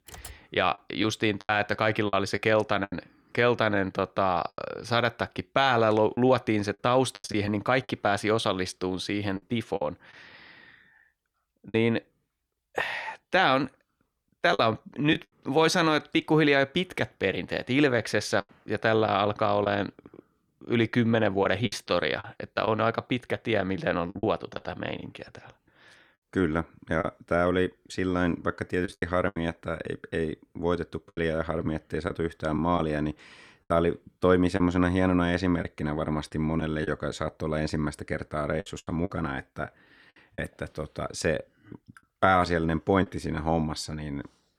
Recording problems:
choppy; very; 6% of the speech affected
keyboard typing; faint; at the start; peak 15 dB below the speech

